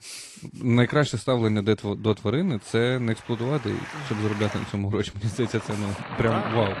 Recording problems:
garbled, watery; slightly; nothing above 11.5 kHz
rain or running water; noticeable; throughout; 10 dB below the speech

